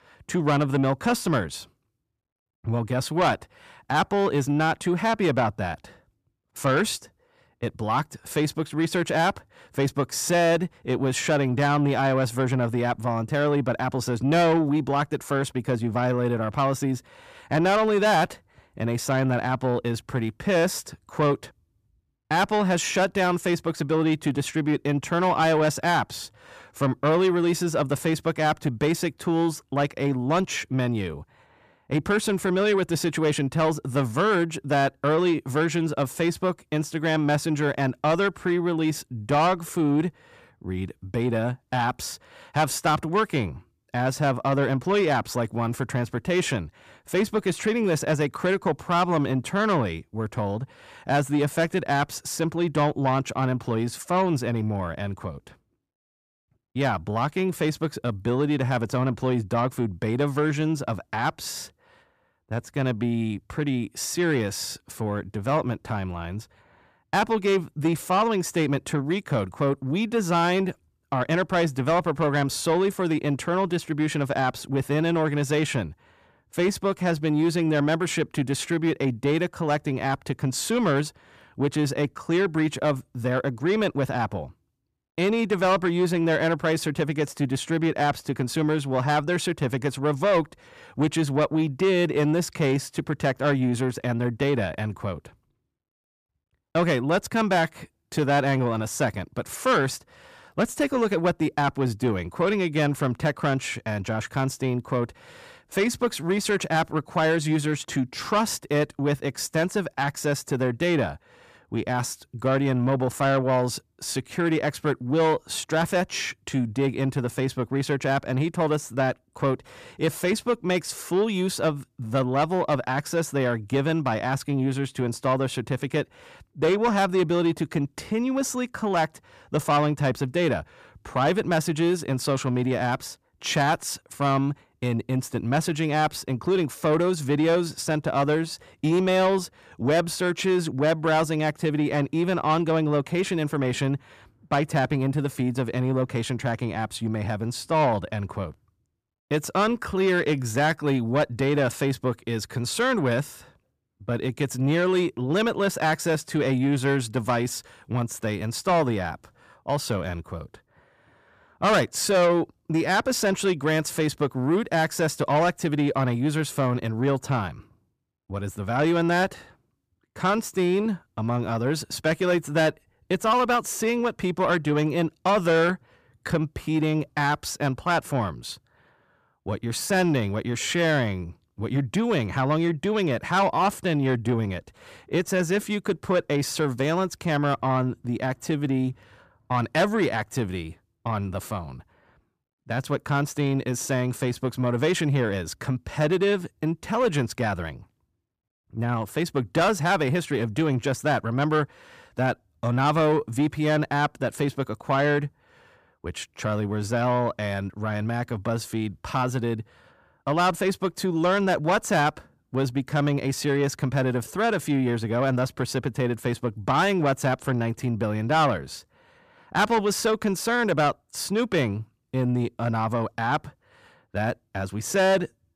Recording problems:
distortion; slight; 10 dB below the speech

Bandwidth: 14.5 kHz